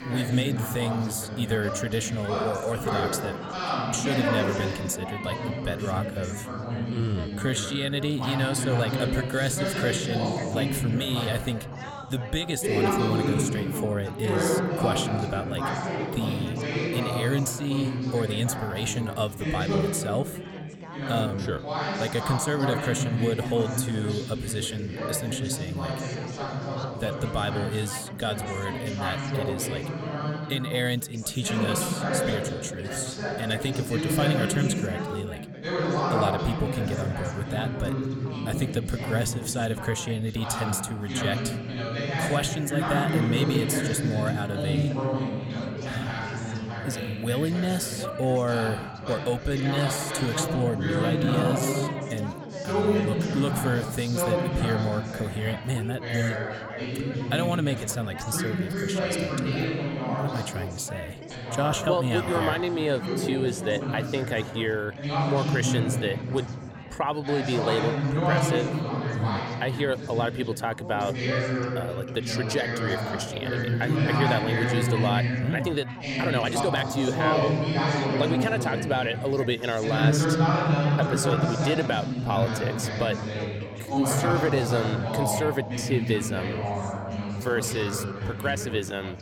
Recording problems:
chatter from many people; very loud; throughout; as loud as the speech
uneven, jittery; strongly; from 7 s to 1:28

